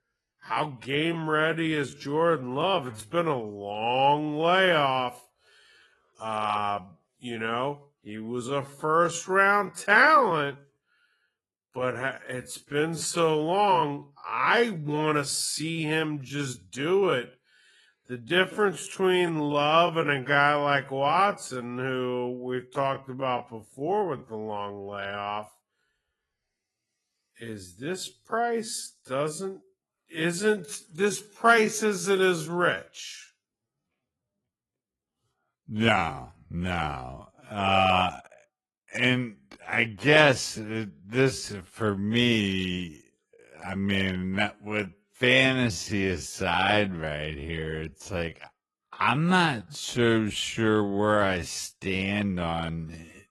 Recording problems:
wrong speed, natural pitch; too slow; 0.5 times normal speed
garbled, watery; slightly; nothing above 11.5 kHz

